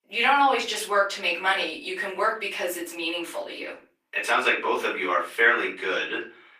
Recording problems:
off-mic speech; far
thin; very; fading below 350 Hz
room echo; slight; dies away in 0.3 s
garbled, watery; slightly; nothing above 15 kHz

